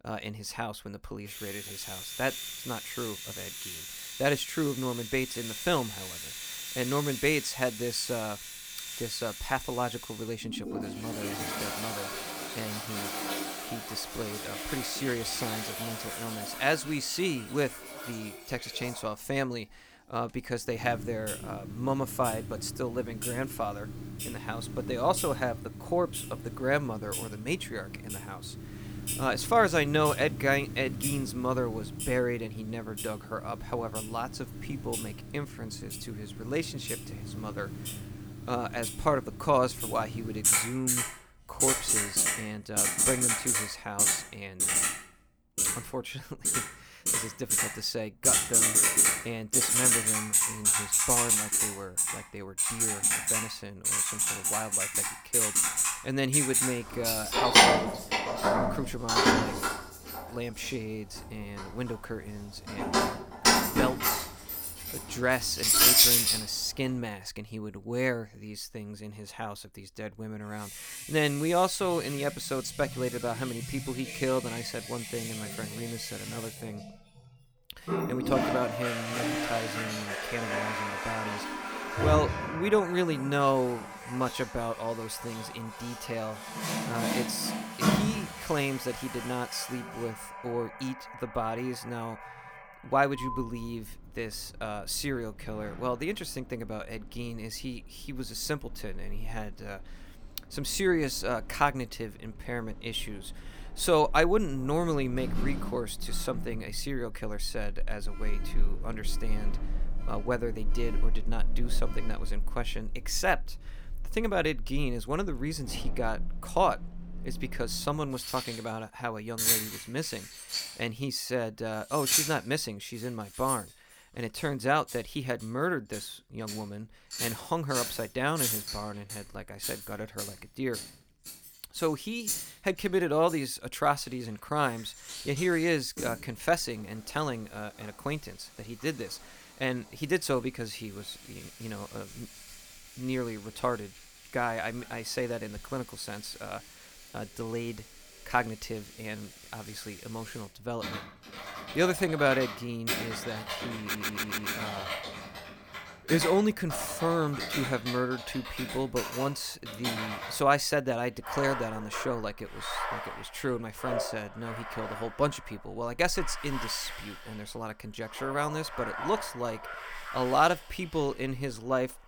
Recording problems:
household noises; very loud; throughout; 3 dB above the speech
audio stuttering; at 2:34

